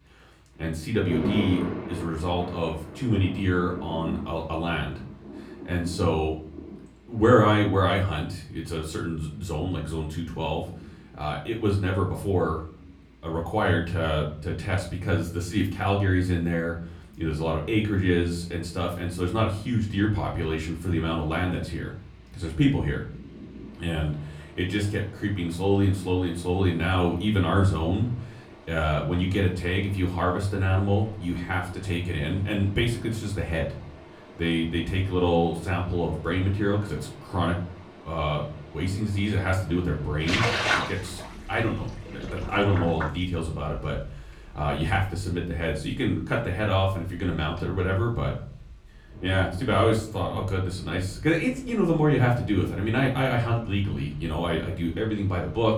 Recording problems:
off-mic speech; far
room echo; slight; dies away in 0.4 s
rain or running water; noticeable; throughout; 10 dB below the speech

